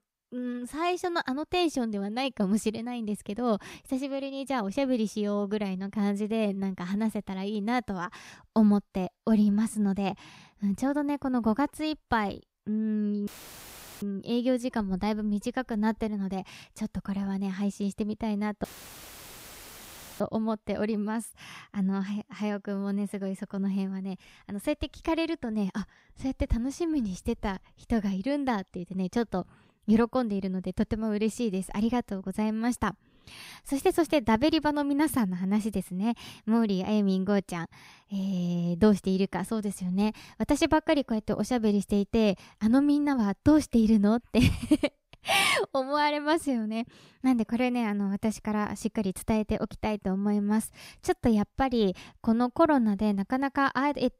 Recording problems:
audio cutting out; filled with static; at 13 s for 1 s and at 19 s for 1.5 s

